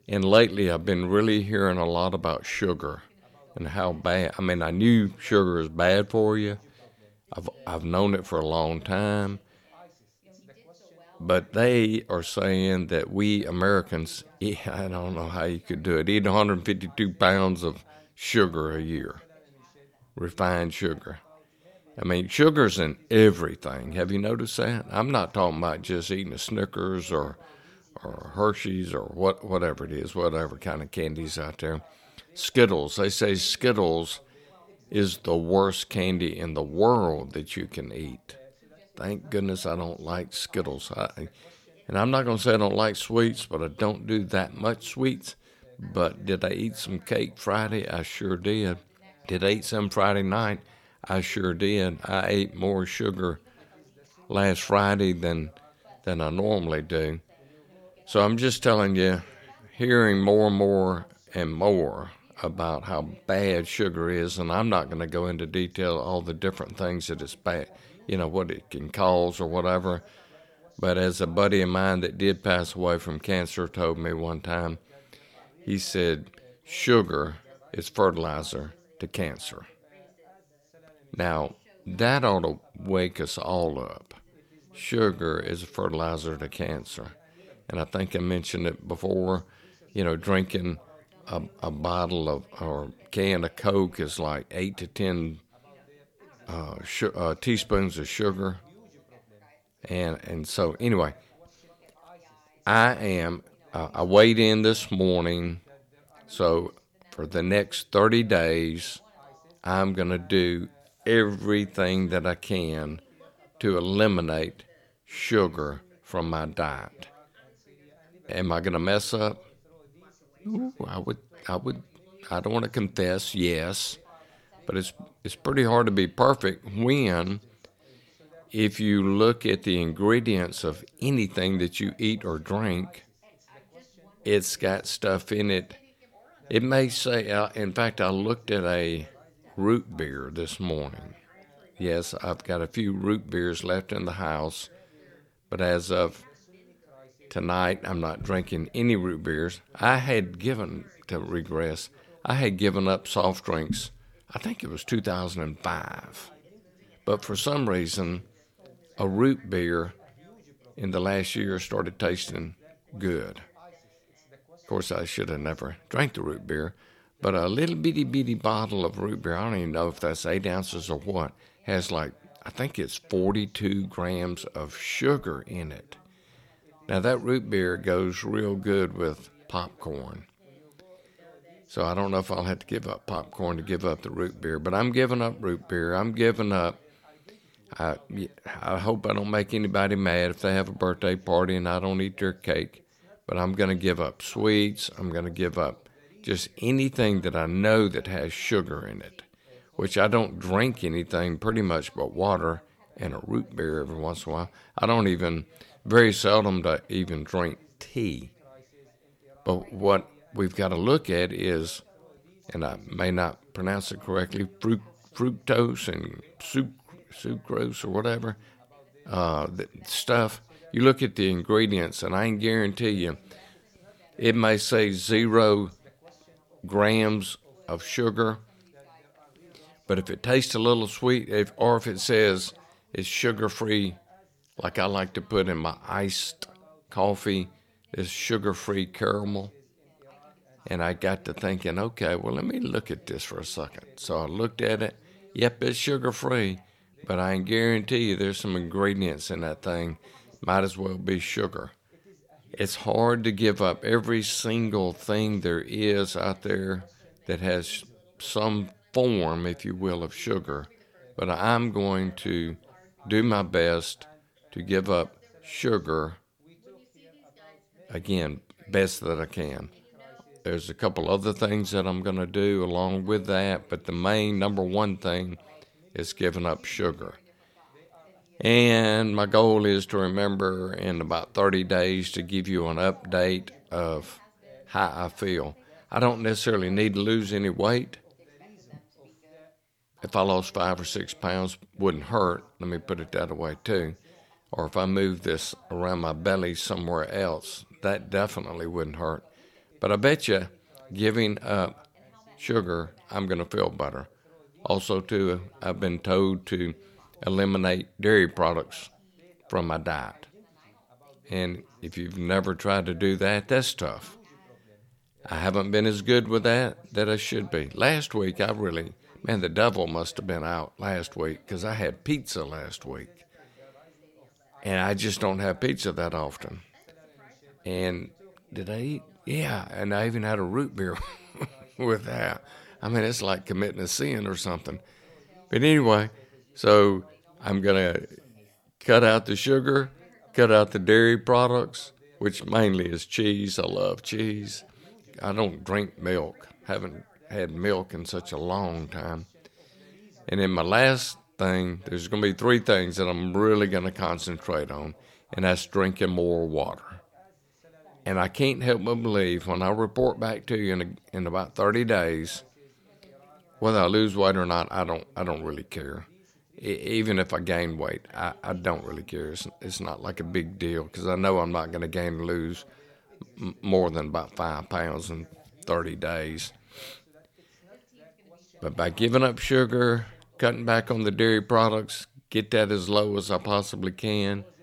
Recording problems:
background chatter; faint; throughout; 2 voices, 30 dB below the speech

